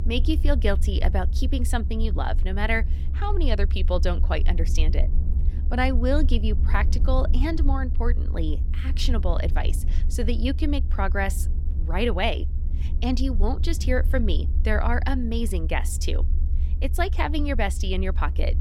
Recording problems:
low rumble; noticeable; throughout; 15 dB below the speech

